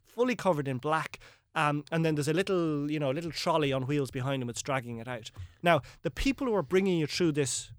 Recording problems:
none

